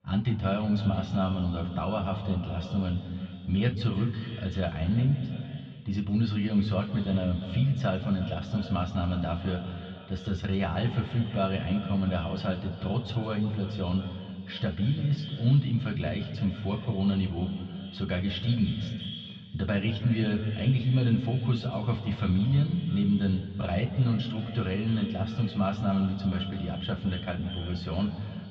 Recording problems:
echo of what is said; noticeable; throughout; 330 ms later, 15 dB below the speech
muffled; slightly; fading above 3.5 kHz
room echo; slight; dies away in 1.7 s
off-mic speech; somewhat distant

